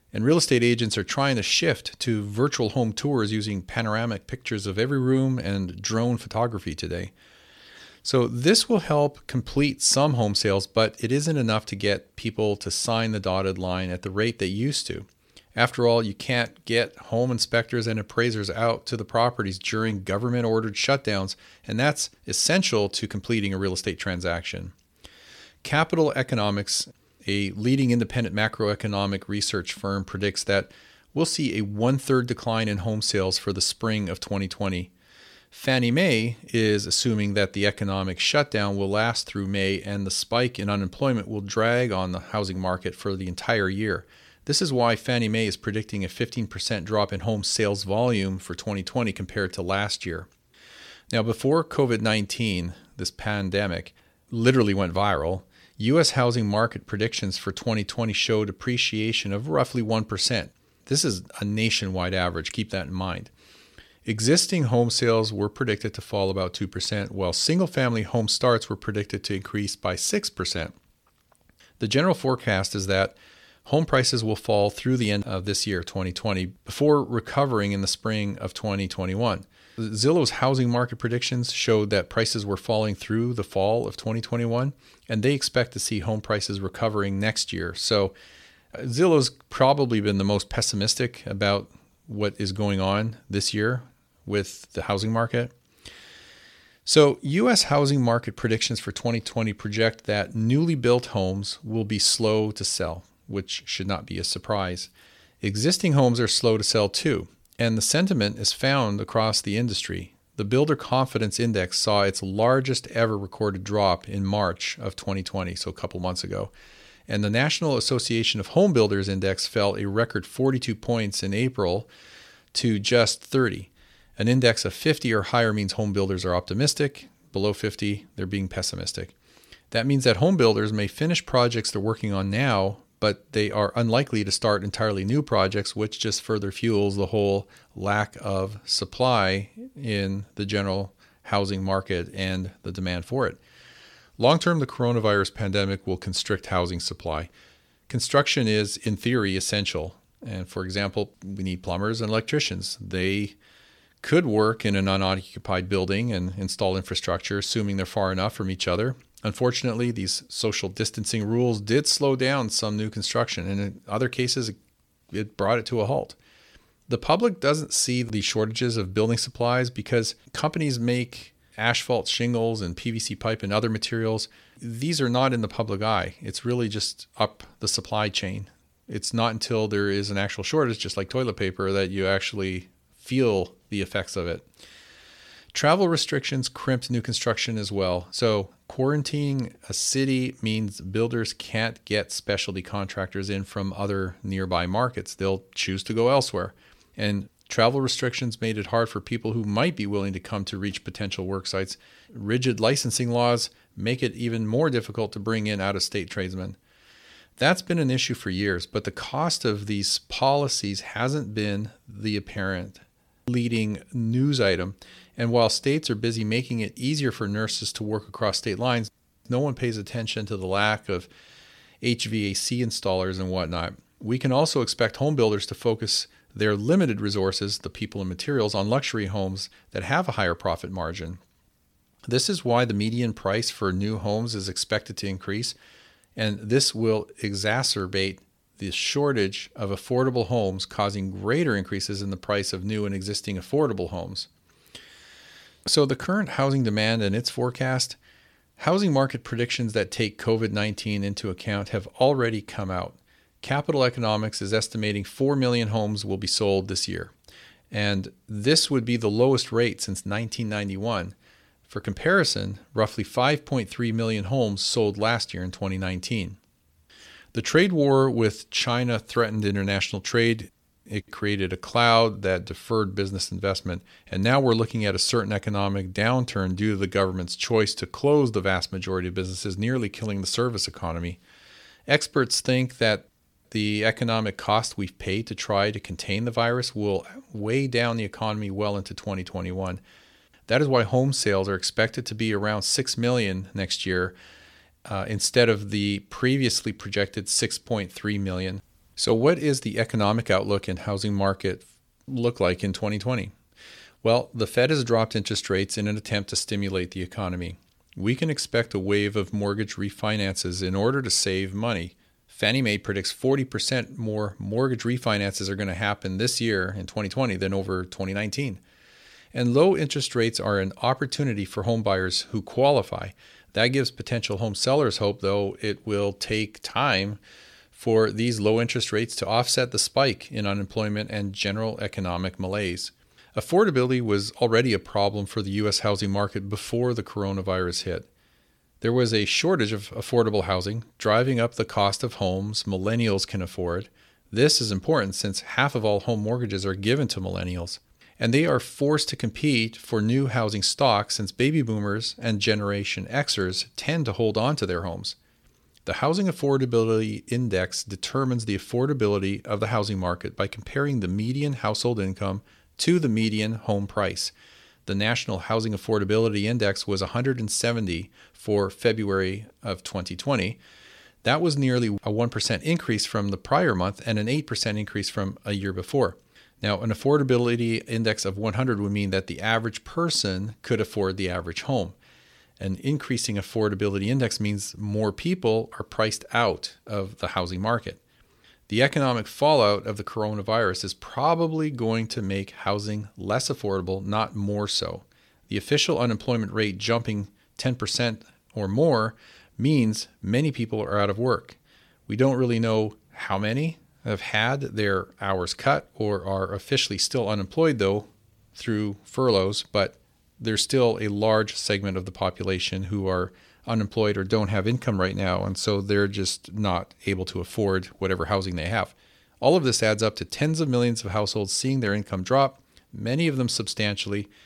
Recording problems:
none

